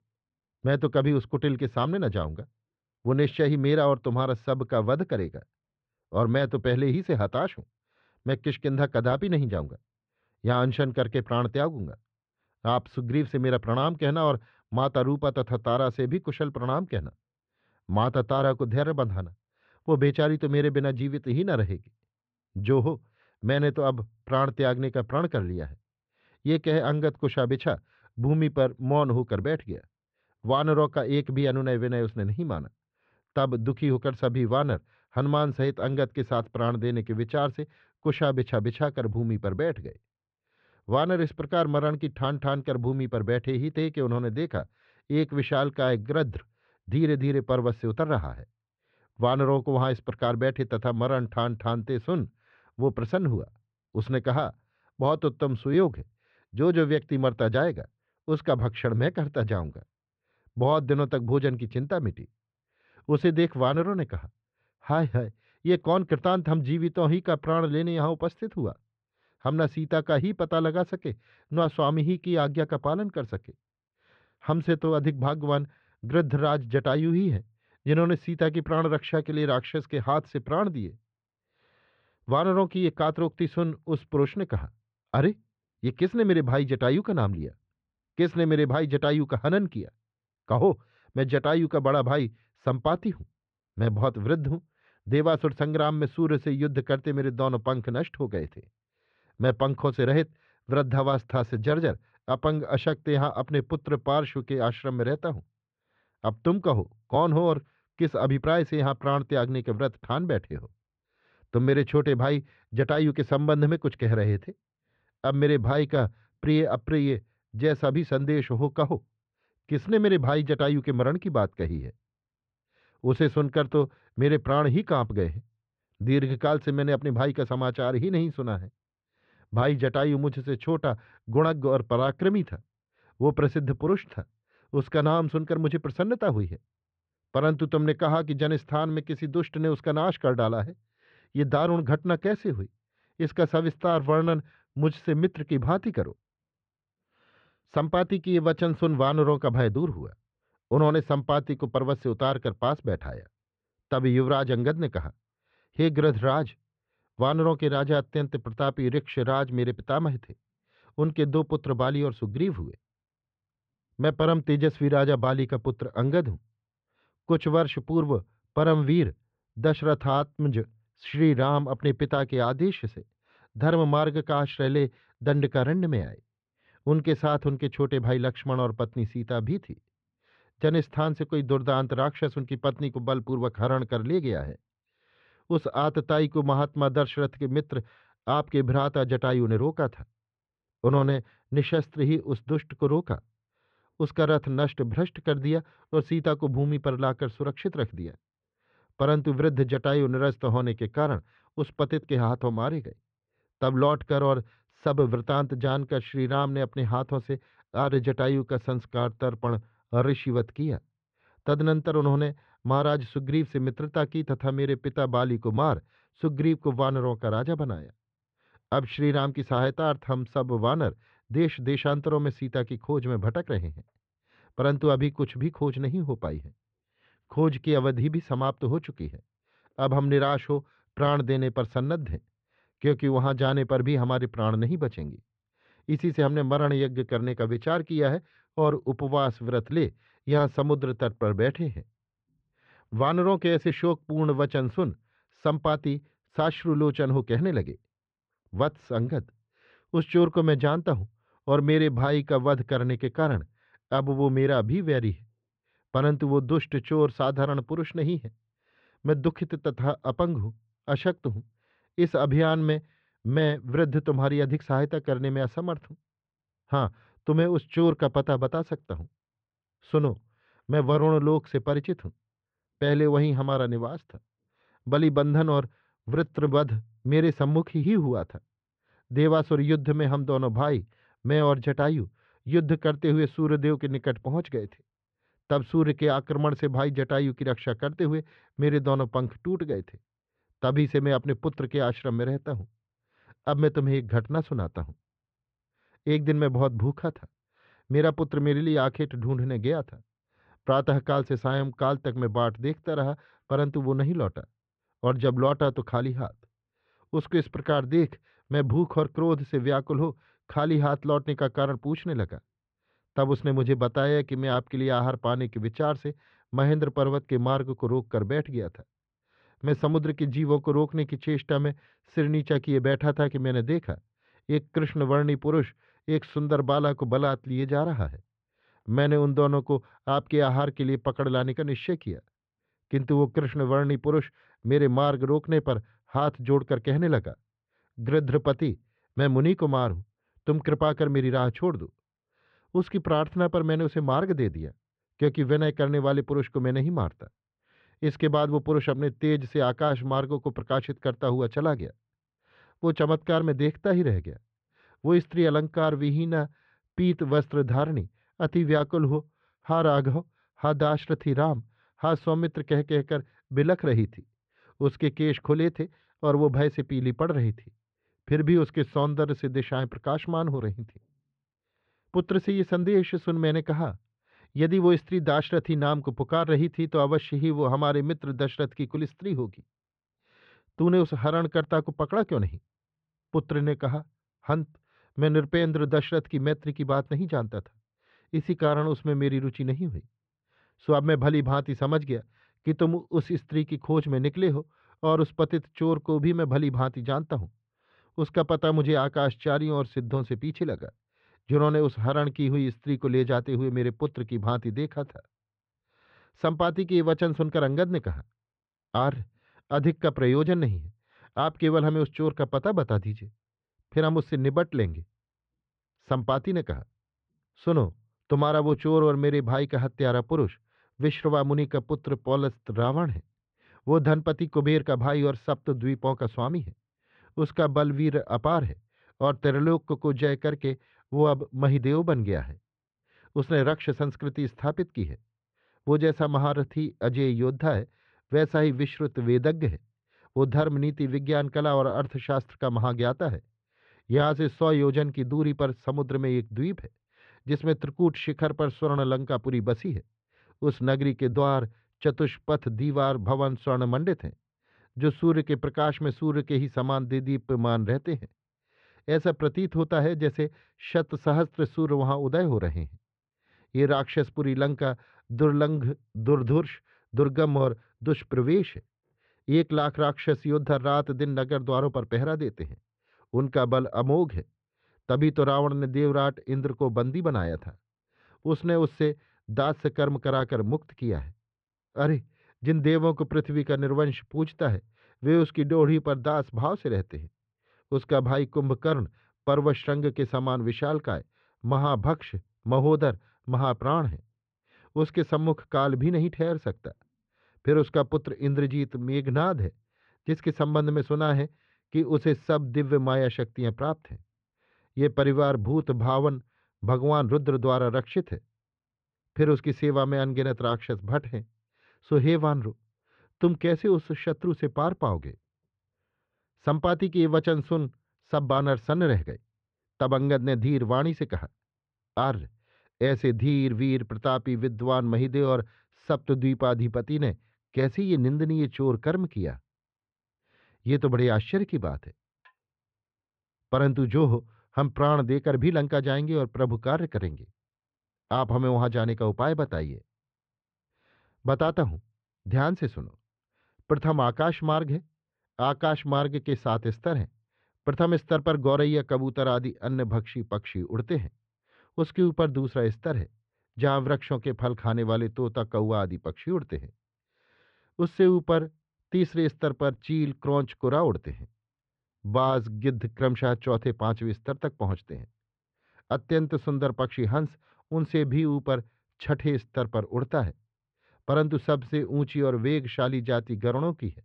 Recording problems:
muffled; very; fading above 3 kHz

